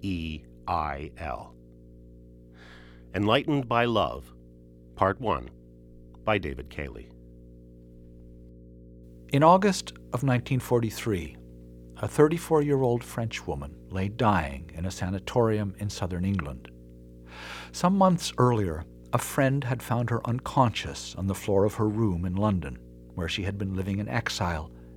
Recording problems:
electrical hum; faint; throughout; 60 Hz, 30 dB below the speech

